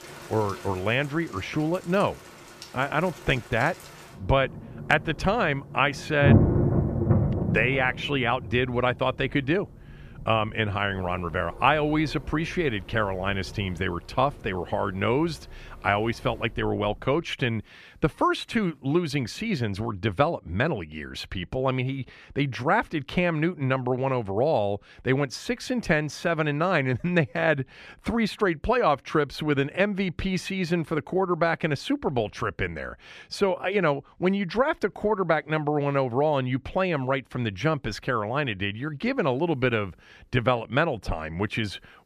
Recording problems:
rain or running water; loud; until 17 s; 2 dB below the speech

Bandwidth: 14.5 kHz